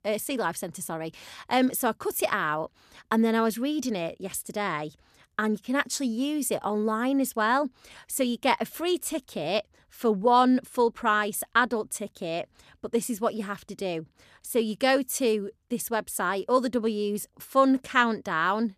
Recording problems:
none

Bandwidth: 14.5 kHz